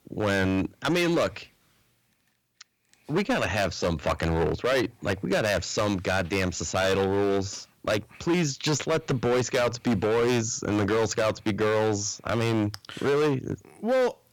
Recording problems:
distortion; heavy; 13% of the sound clipped

